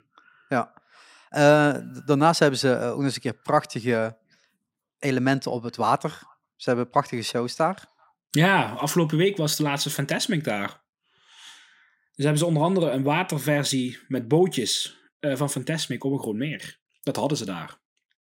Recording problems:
none

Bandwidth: 16 kHz